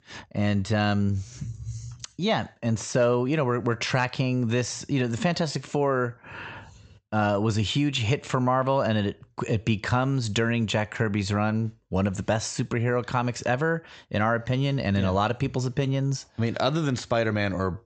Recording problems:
high frequencies cut off; noticeable; nothing above 8 kHz

